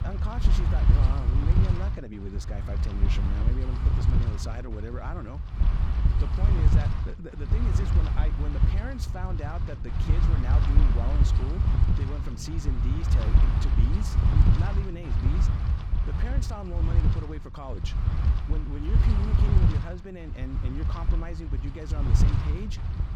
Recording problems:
wind noise on the microphone; heavy; 2 dB above the speech

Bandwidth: 17.5 kHz